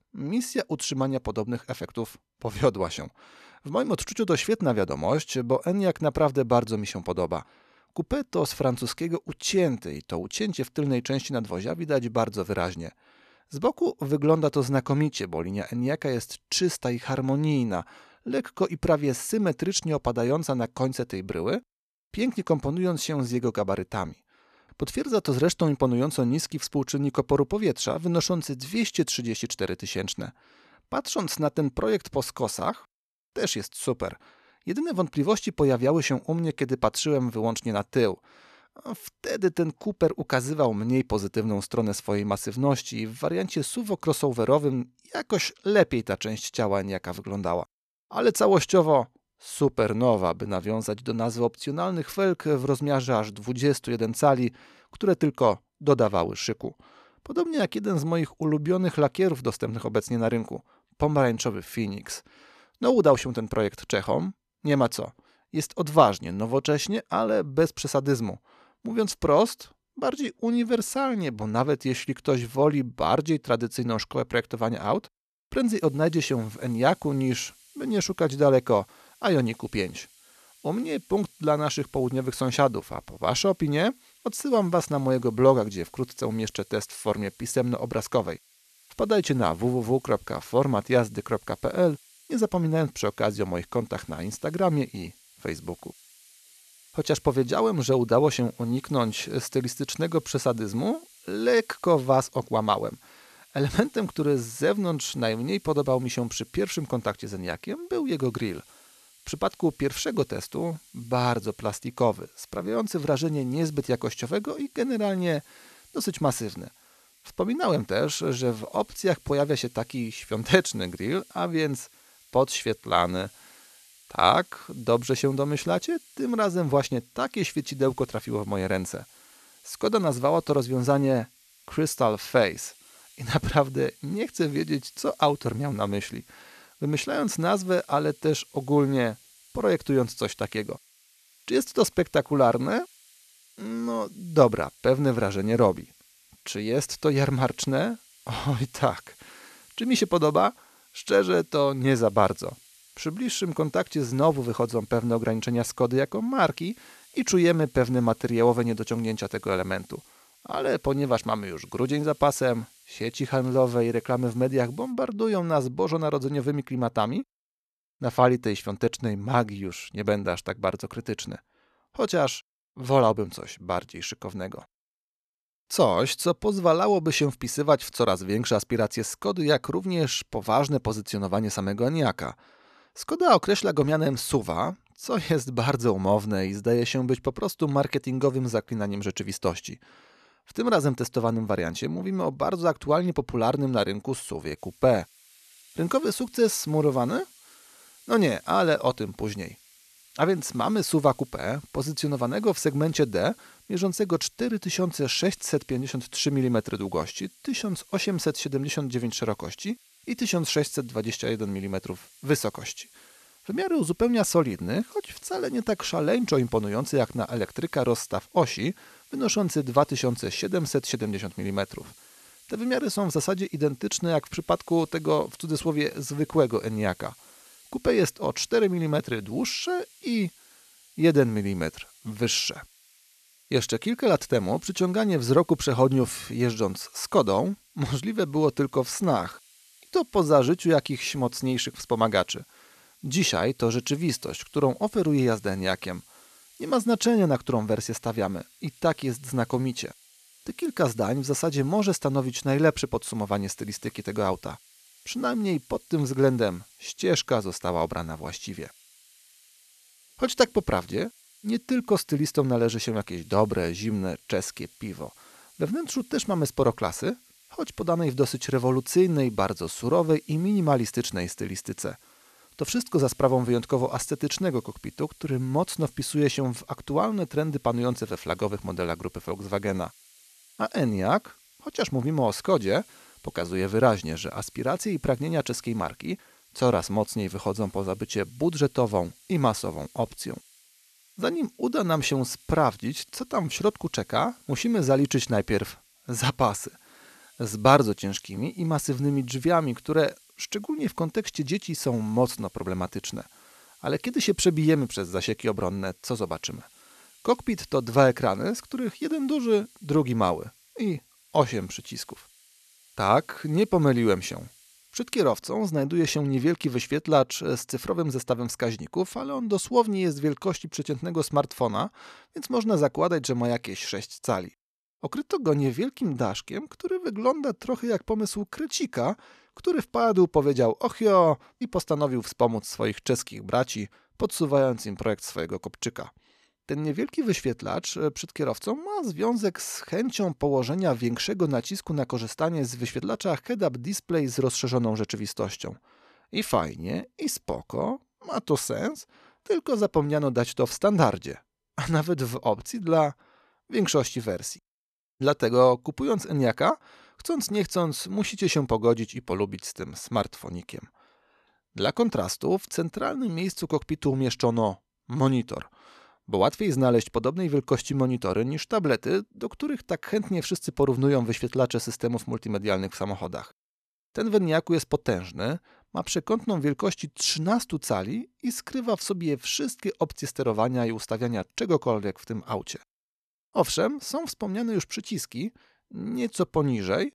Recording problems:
hiss; faint; from 1:16 to 2:45 and from 3:15 to 5:15; 25 dB below the speech

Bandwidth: 13.5 kHz